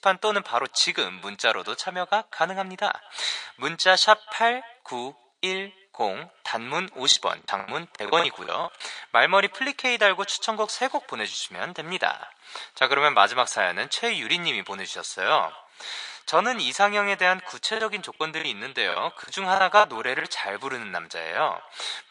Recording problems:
thin; very; fading below 850 Hz
echo of what is said; faint; throughout; 190 ms later, 25 dB below the speech
garbled, watery; slightly; nothing above 8.5 kHz
choppy; very; from 7 to 8.5 s and from 18 to 20 s; 15% of the speech affected

